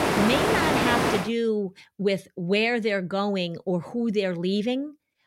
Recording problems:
rain or running water; very loud; until 1 s; 3 dB above the speech

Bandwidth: 16 kHz